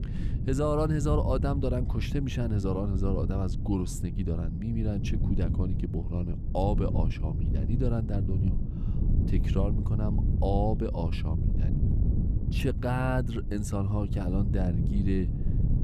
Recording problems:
wind noise on the microphone; heavy; 8 dB below the speech

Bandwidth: 14.5 kHz